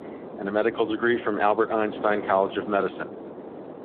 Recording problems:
phone-call audio
wind noise on the microphone; occasional gusts; 15 dB below the speech

